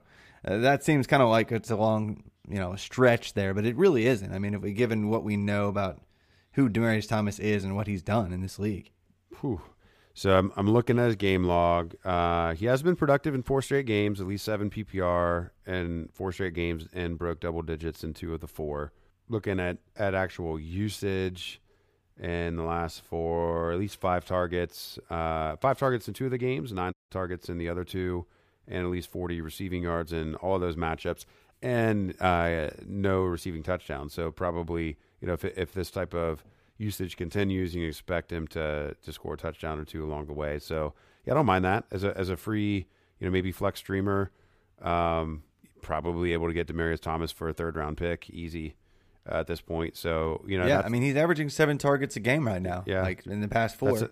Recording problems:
audio cutting out; at 27 s

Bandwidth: 15 kHz